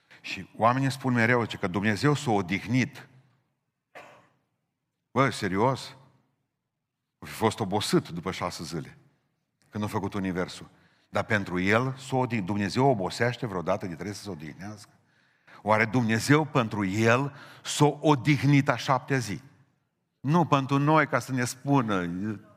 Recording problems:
none

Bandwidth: 15 kHz